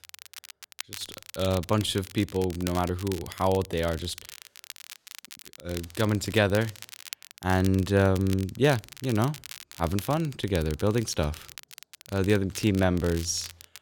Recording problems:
crackle, like an old record; noticeable; 15 dB below the speech

